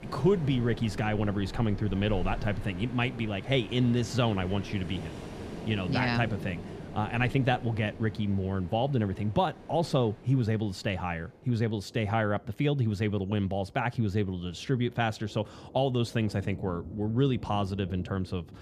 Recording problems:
rain or running water; noticeable; throughout; 15 dB below the speech

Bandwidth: 14.5 kHz